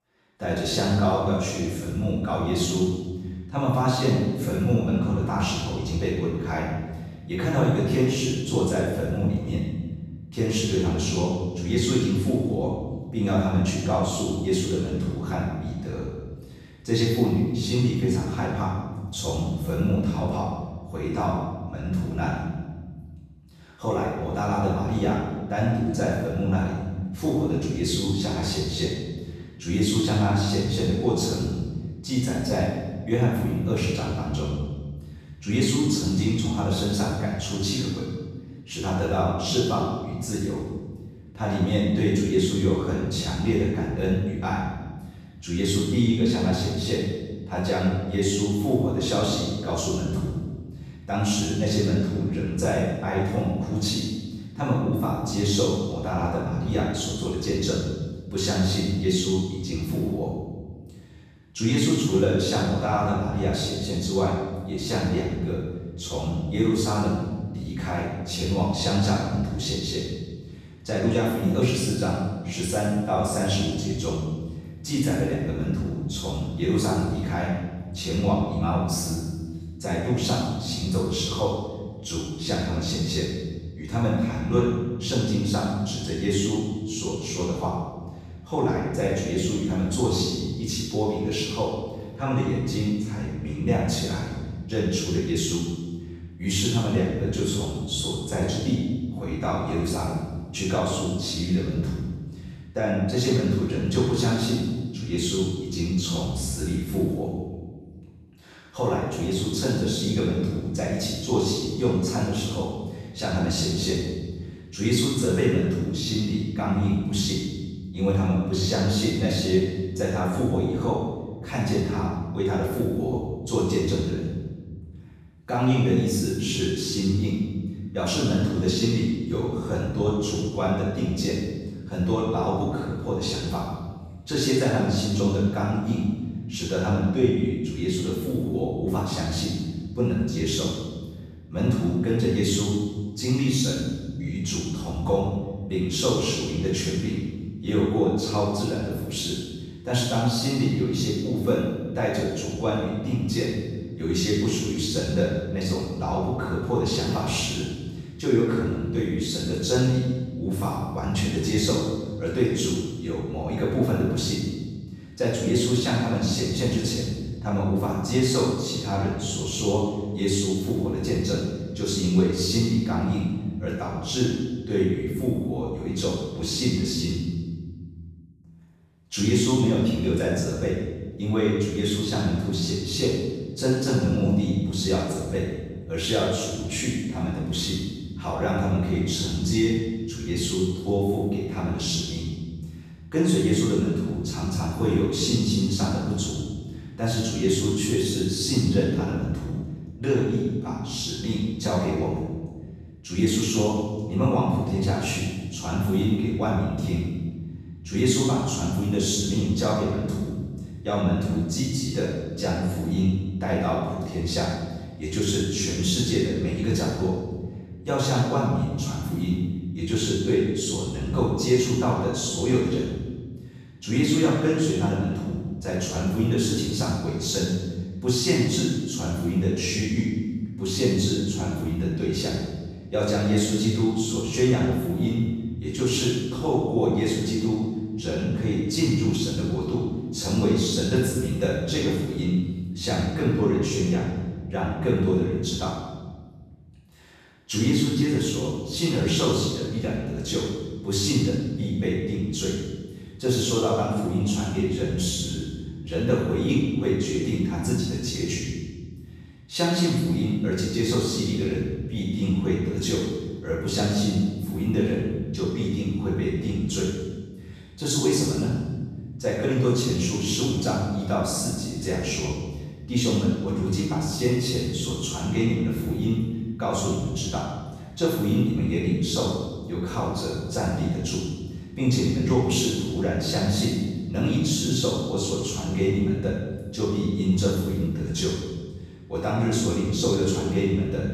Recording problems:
room echo; strong; dies away in 1.6 s
off-mic speech; far

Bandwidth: 14.5 kHz